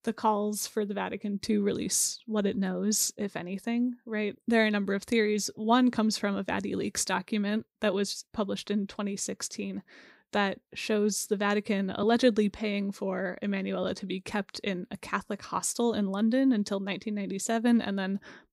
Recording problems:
none

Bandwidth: 15.5 kHz